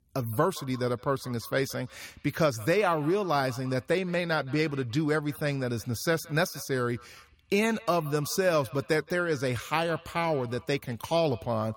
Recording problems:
echo of what is said; faint; throughout; 170 ms later, 20 dB below the speech

